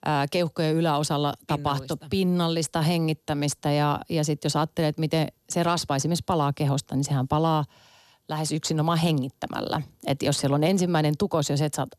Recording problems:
none

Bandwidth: 13.5 kHz